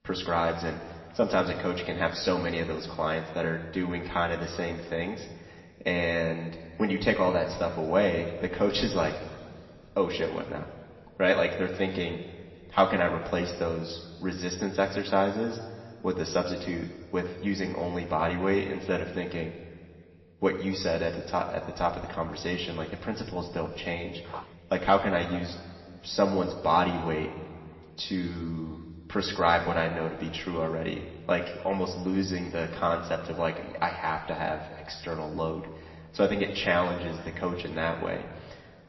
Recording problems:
room echo; slight; dies away in 2.2 s
off-mic speech; somewhat distant
garbled, watery; slightly; nothing above 5.5 kHz
footsteps; faint; at 24 s; peak 15 dB below the speech

